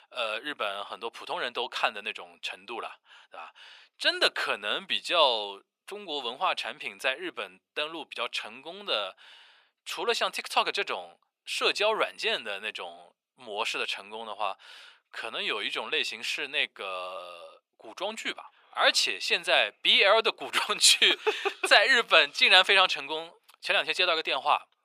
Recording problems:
thin; very; fading below 550 Hz

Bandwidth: 15 kHz